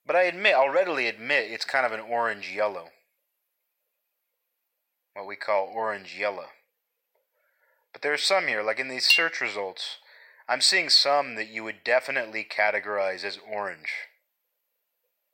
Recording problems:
thin; very; fading below 800 Hz
clattering dishes; loud; at 9 s; peak 3 dB above the speech

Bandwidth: 16 kHz